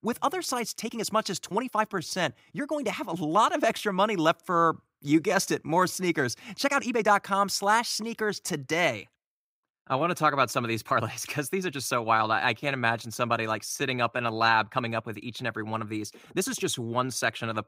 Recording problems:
uneven, jittery; strongly; from 1 to 17 s

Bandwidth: 15.5 kHz